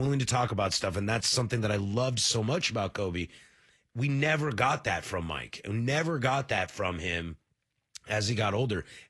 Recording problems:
garbled, watery; slightly; nothing above 11.5 kHz
abrupt cut into speech; at the start

